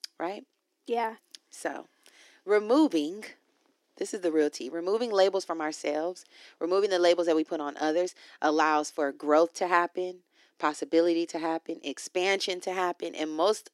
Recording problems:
thin; somewhat; fading below 300 Hz

